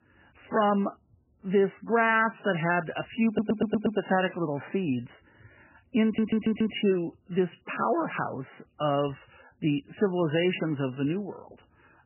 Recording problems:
garbled, watery; badly; nothing above 3 kHz
audio stuttering; at 3.5 s and at 6 s

